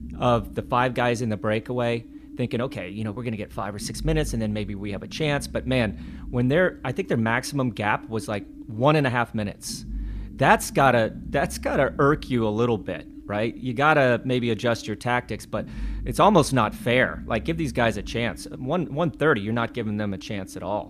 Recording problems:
low rumble; faint; throughout; 25 dB below the speech

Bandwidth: 14.5 kHz